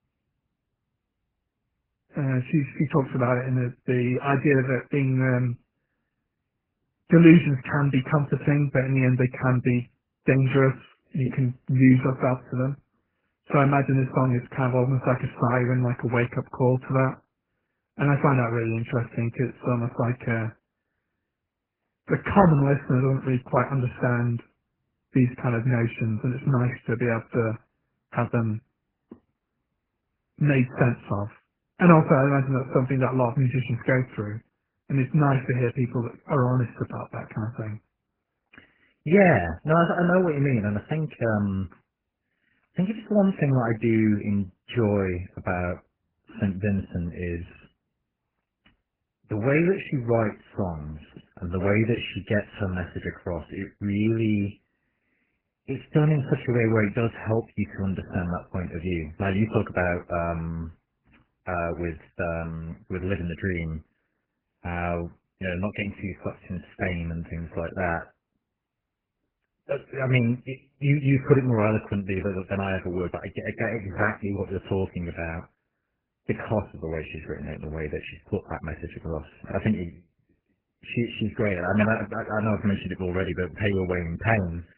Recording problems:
garbled, watery; badly; nothing above 3 kHz

